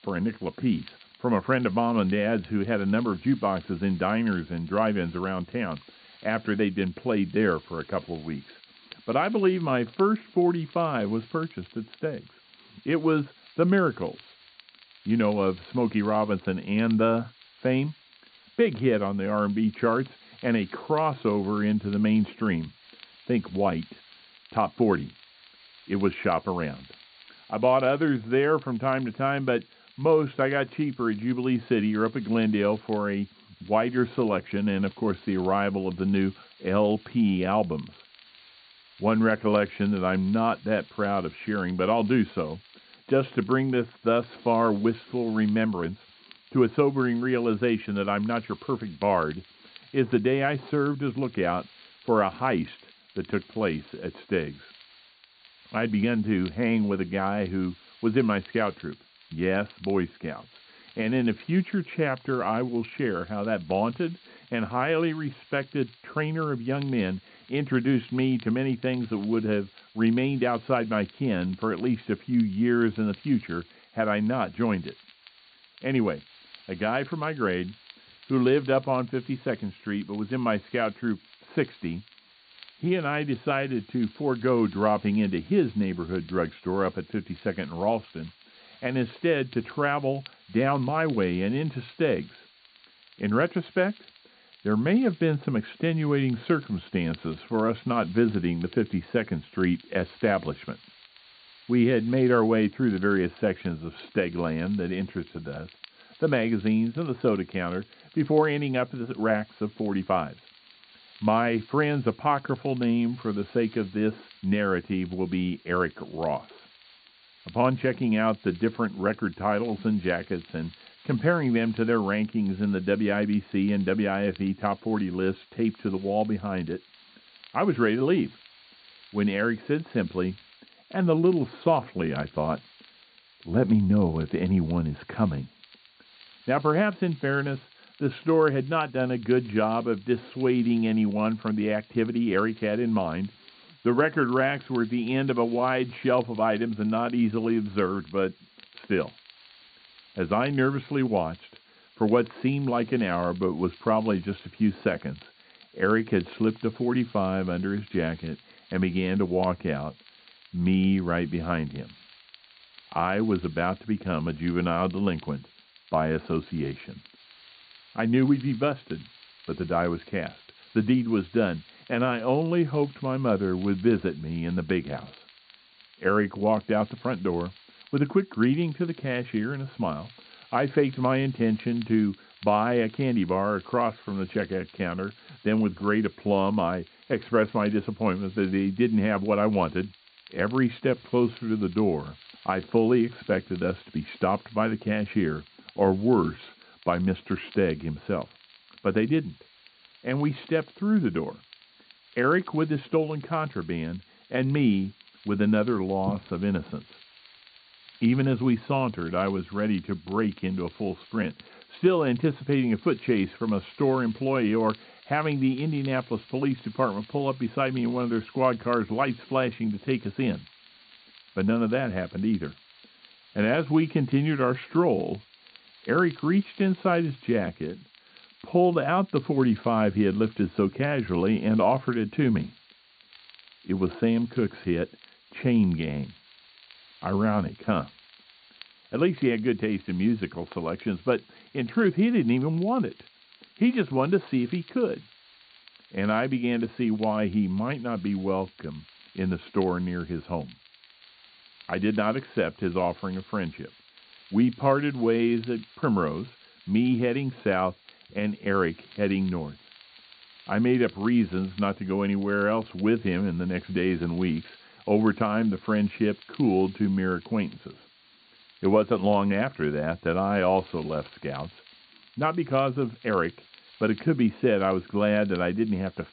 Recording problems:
muffled; very; fading above 3.5 kHz
high frequencies cut off; severe; nothing above 4.5 kHz
hiss; faint; throughout; 25 dB below the speech
crackle, like an old record; faint; 30 dB below the speech

